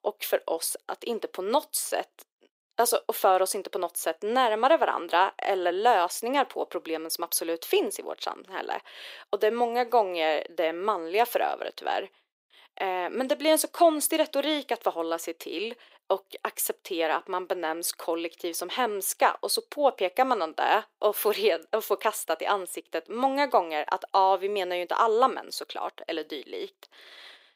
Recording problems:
thin; very; fading below 400 Hz

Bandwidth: 15.5 kHz